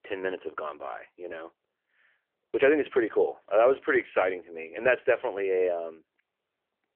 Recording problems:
phone-call audio

